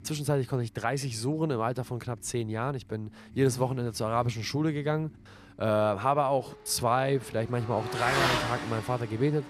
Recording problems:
traffic noise; loud; throughout; 3 dB below the speech

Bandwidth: 14.5 kHz